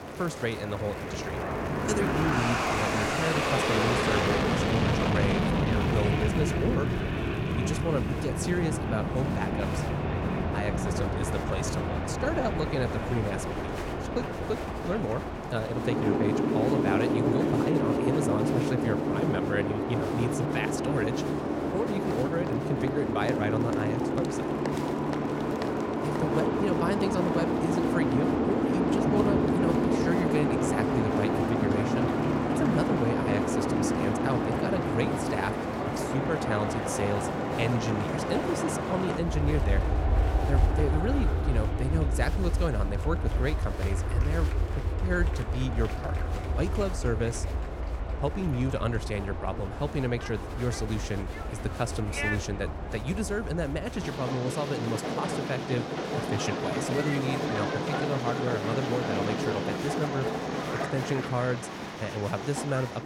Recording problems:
train or aircraft noise; very loud; throughout; 3 dB above the speech
crowd noise; noticeable; throughout; 15 dB below the speech

